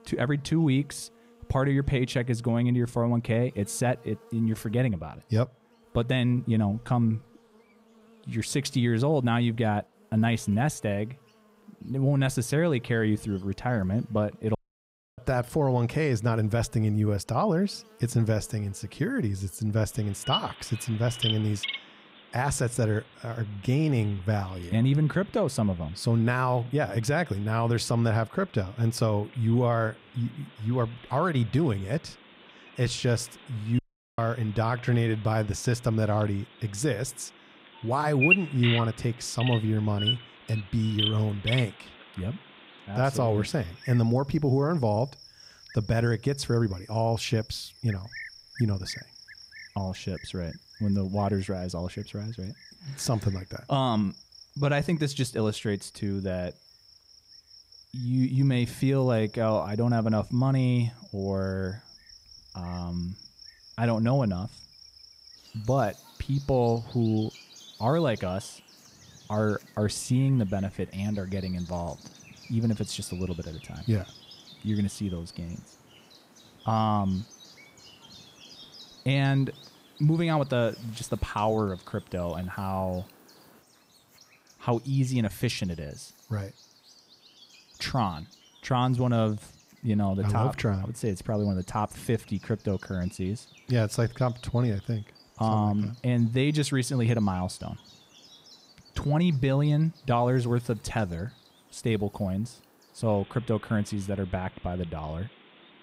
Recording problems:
animal sounds; noticeable; throughout; 10 dB below the speech
audio cutting out; at 15 s for 0.5 s and at 34 s

